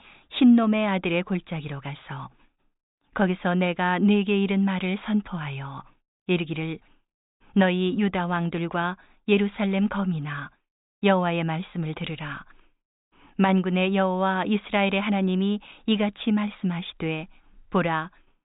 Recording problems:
high frequencies cut off; severe; nothing above 4 kHz

